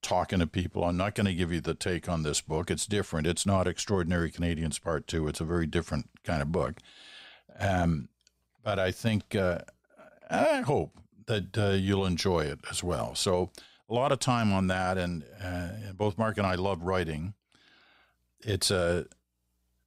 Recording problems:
none

